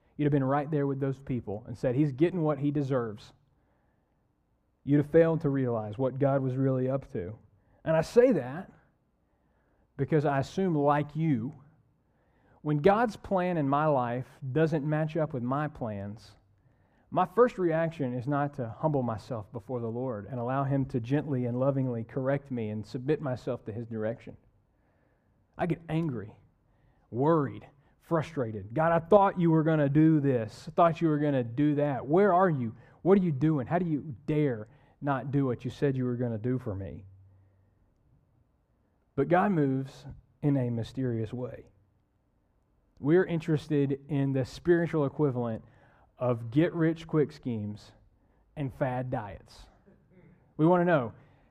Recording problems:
muffled; very; fading above 2 kHz

